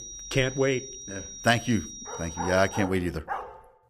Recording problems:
high-pitched whine; noticeable; until 3 s; 5.5 kHz, 10 dB below the speech
dog barking; noticeable; from 2 s on; peak 8 dB below the speech

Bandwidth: 15 kHz